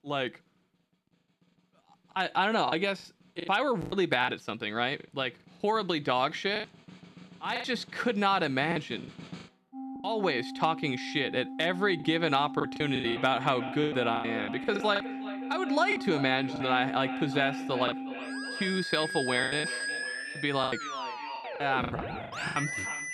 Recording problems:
echo of what is said; noticeable; from 13 s on; 360 ms later, 15 dB below the speech
background music; loud; throughout; 8 dB below the speech
choppy; very; 11% of the speech affected

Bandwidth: 14.5 kHz